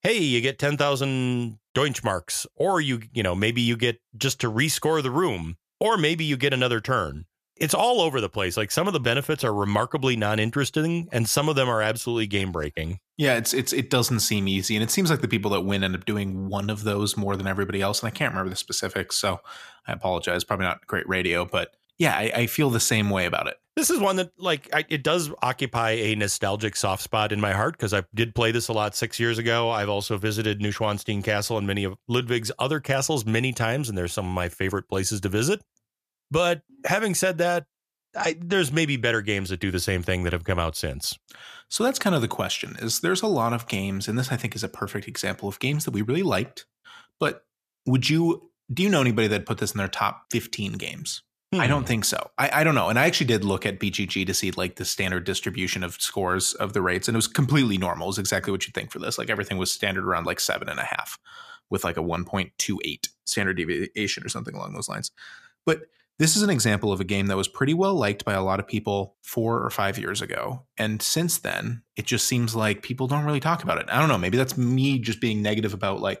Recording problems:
none

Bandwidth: 14.5 kHz